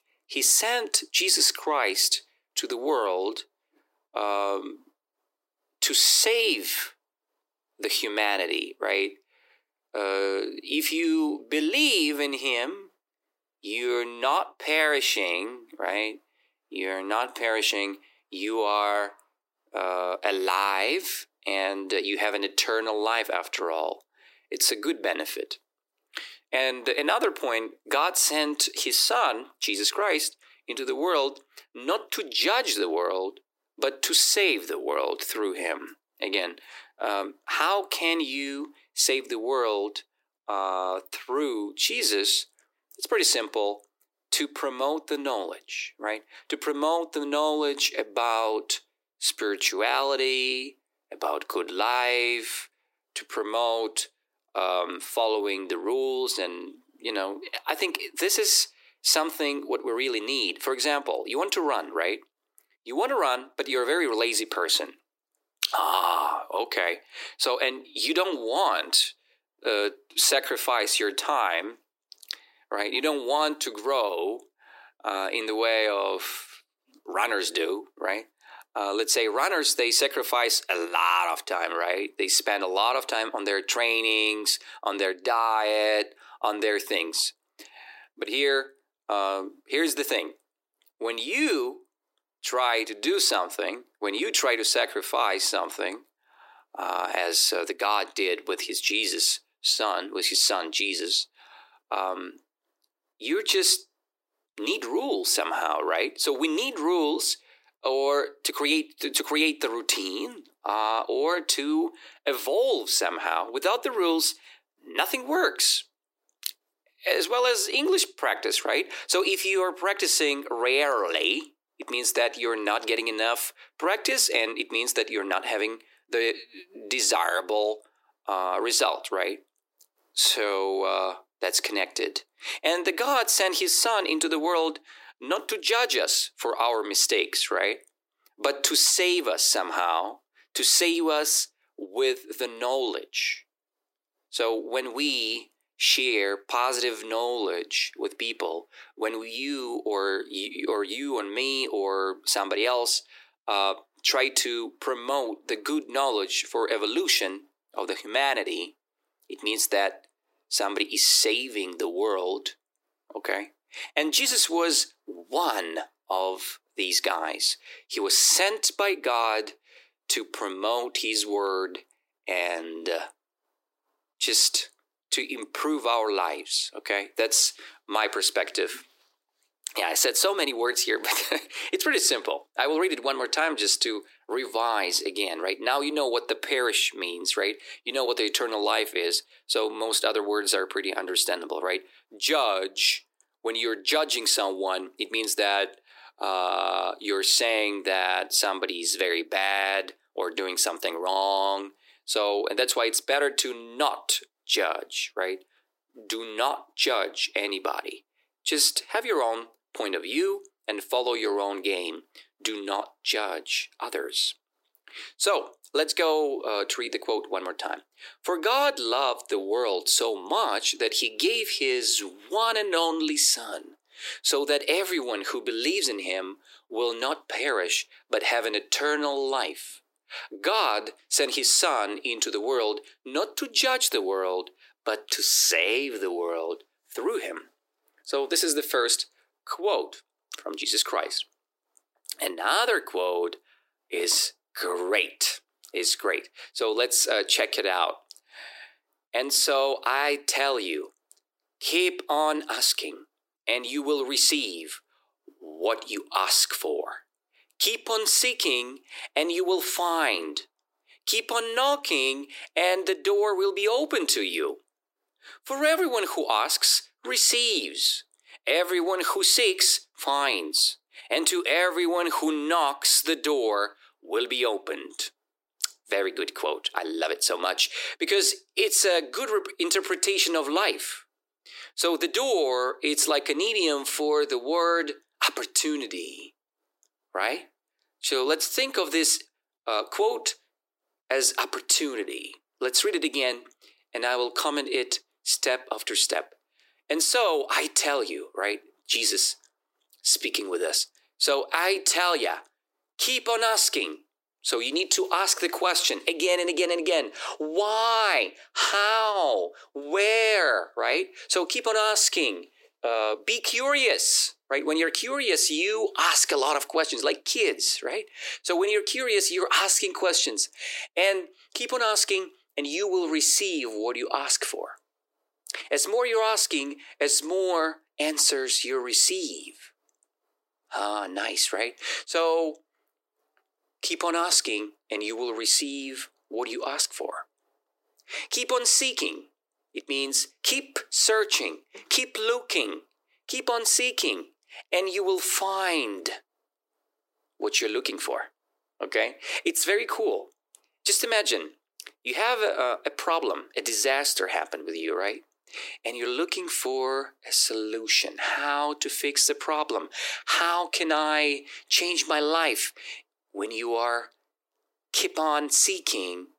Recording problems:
thin; very; fading below 300 Hz

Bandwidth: 16 kHz